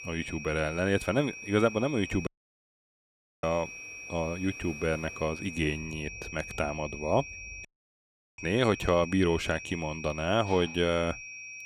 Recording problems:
high-pitched whine; noticeable; throughout; 2.5 kHz, 10 dB below the speech
animal sounds; faint; throughout; 20 dB below the speech
rain or running water; faint; throughout; 25 dB below the speech
audio cutting out; at 2.5 s for 1 s and at 7.5 s for 0.5 s

